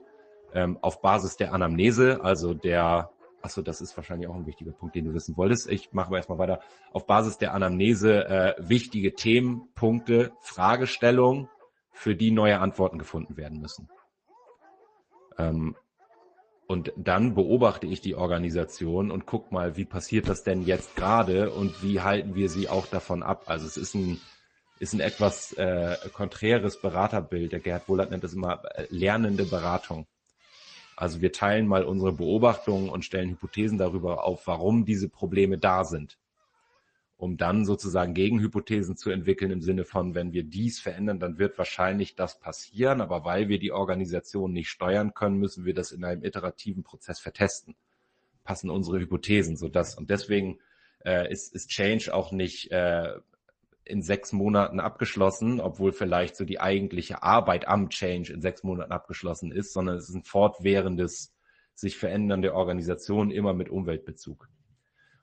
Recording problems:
garbled, watery; slightly; nothing above 8 kHz
animal sounds; faint; throughout; 20 dB below the speech

